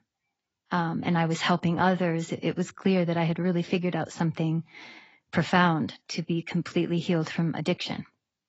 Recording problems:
garbled, watery; badly; nothing above 7.5 kHz

